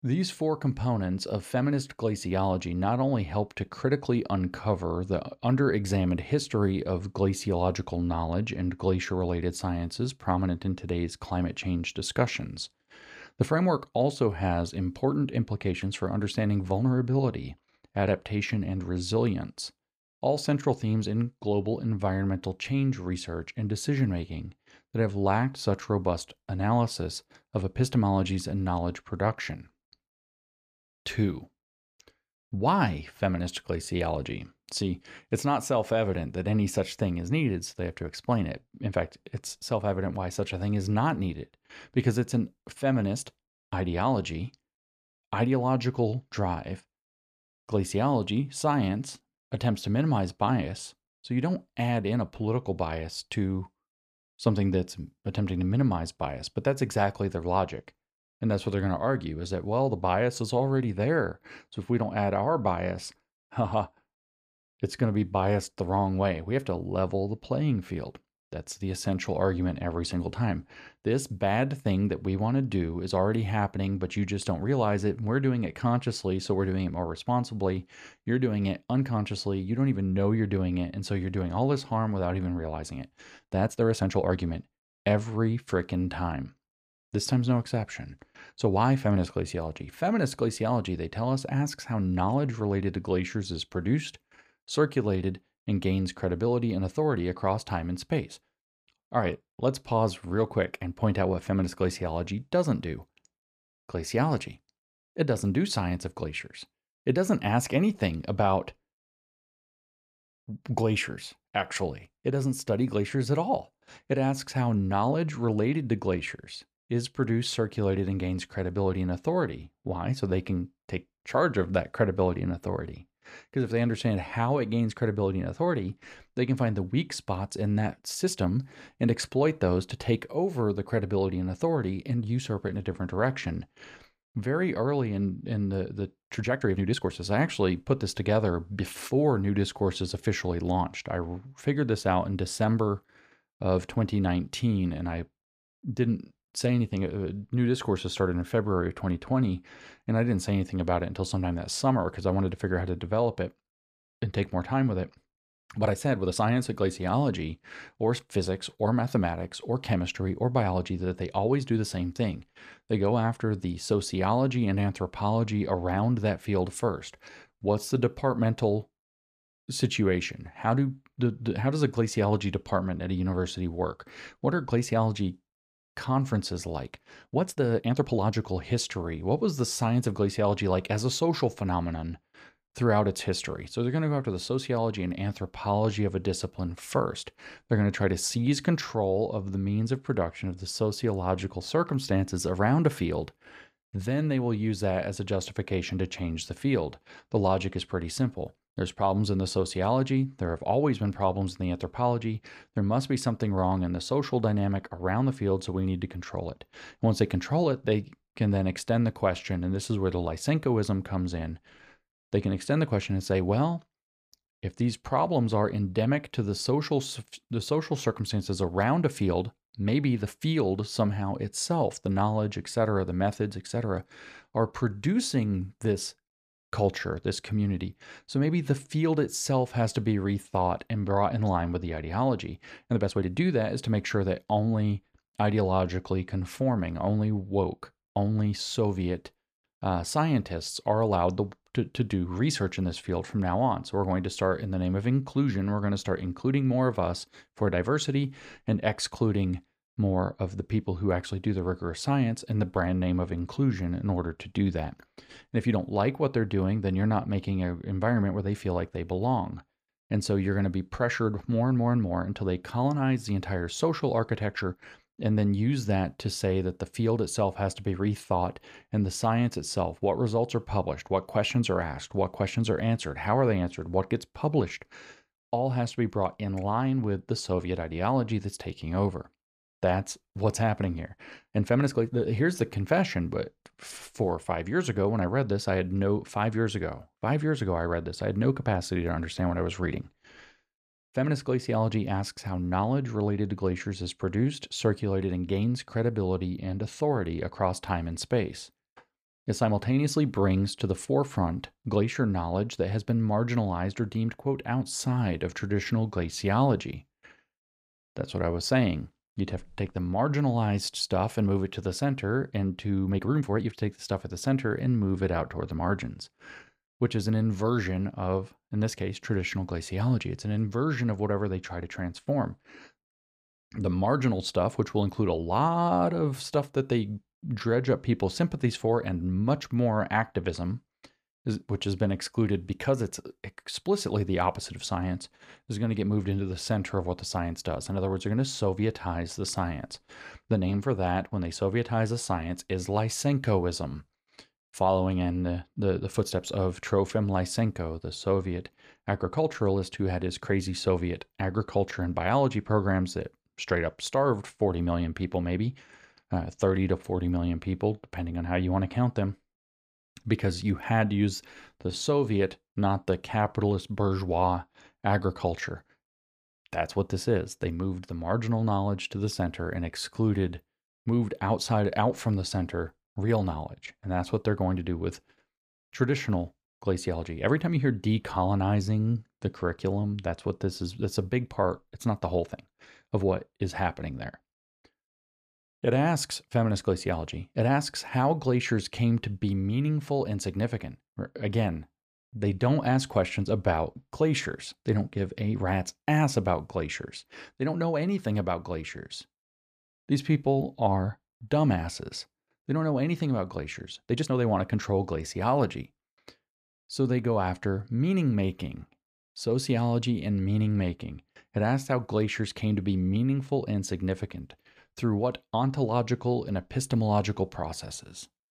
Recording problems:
uneven, jittery; strongly; from 1:23 to 6:44

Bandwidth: 14.5 kHz